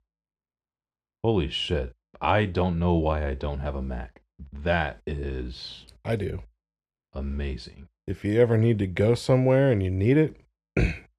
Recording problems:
muffled; slightly; fading above 3 kHz

